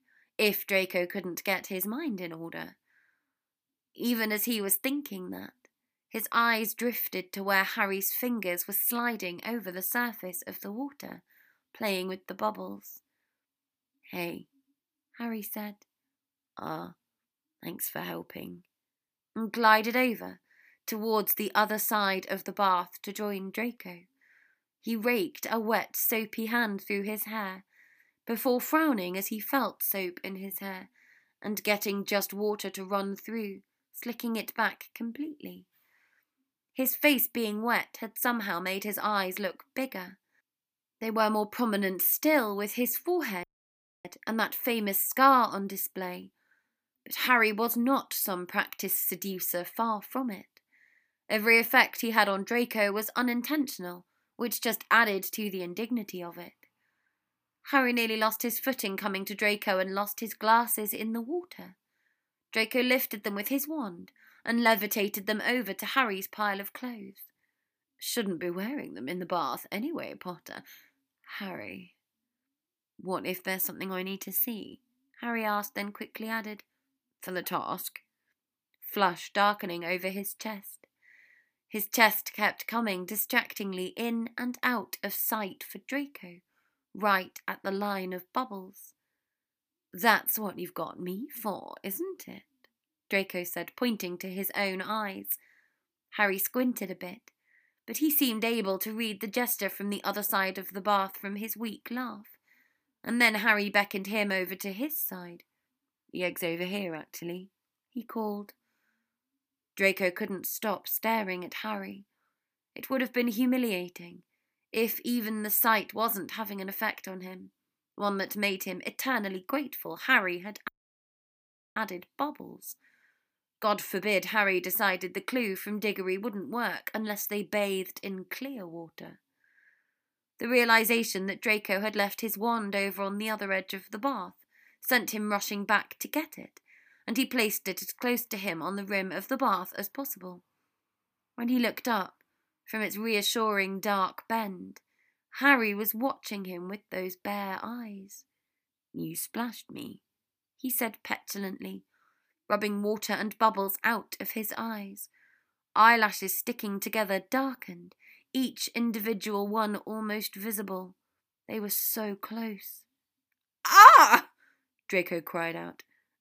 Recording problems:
audio cutting out; at 43 s for 0.5 s and at 2:01 for 1 s

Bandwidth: 15 kHz